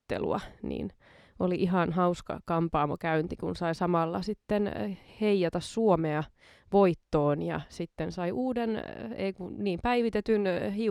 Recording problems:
abrupt cut into speech; at the end

